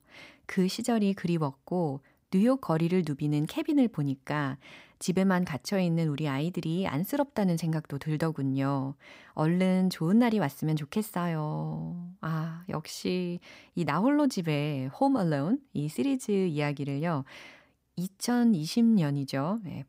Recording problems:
none

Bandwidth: 15.5 kHz